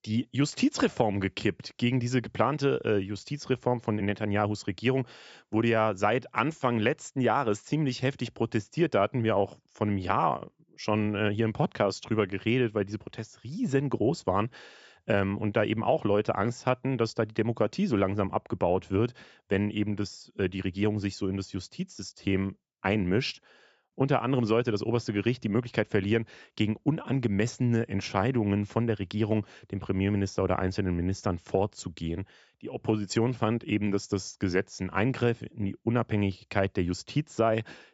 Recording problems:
high frequencies cut off; noticeable; nothing above 8 kHz

